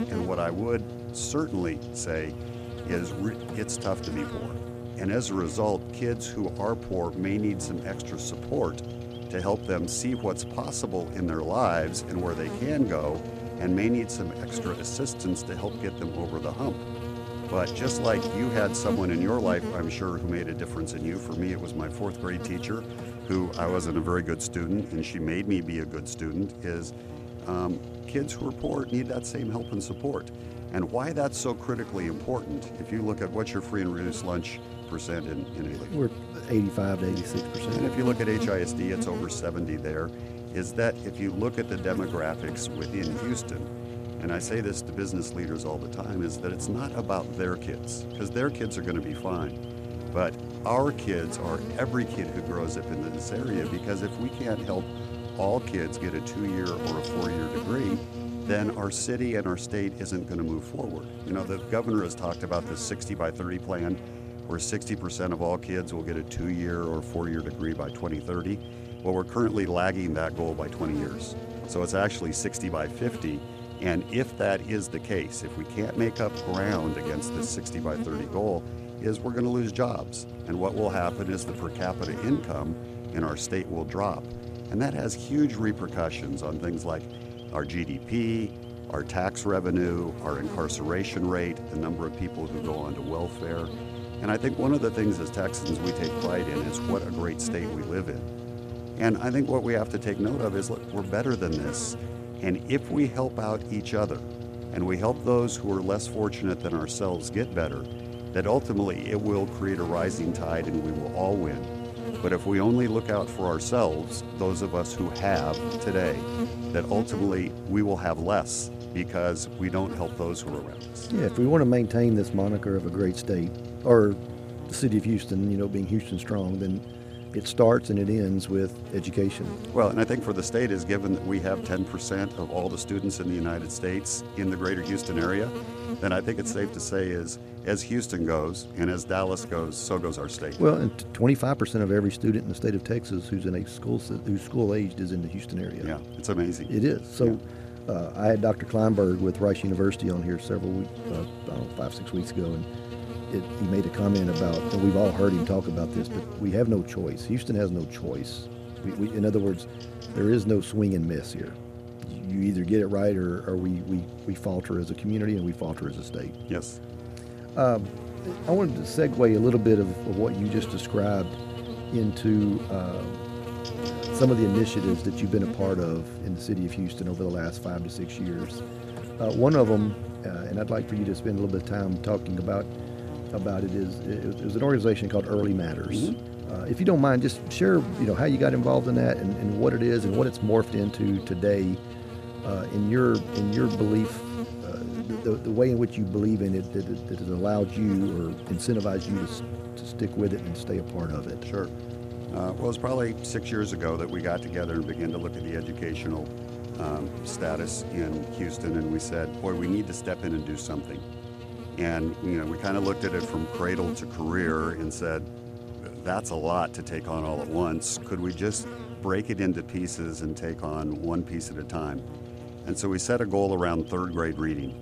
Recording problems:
electrical hum; loud; throughout; 60 Hz, 9 dB below the speech

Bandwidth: 14.5 kHz